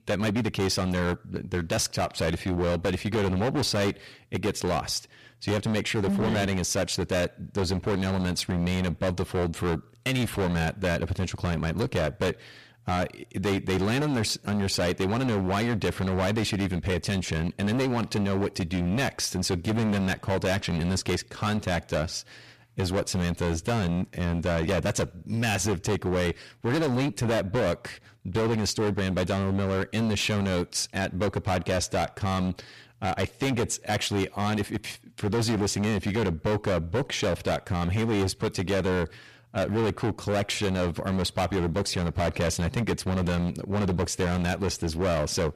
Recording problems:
distortion; heavy; 22% of the sound clipped

